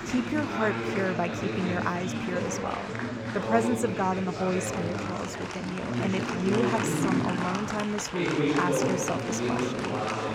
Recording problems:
chatter from many people; very loud; throughout; 1 dB above the speech

